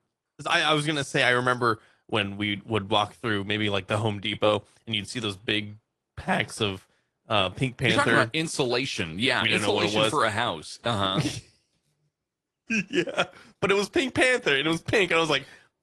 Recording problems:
garbled, watery; slightly

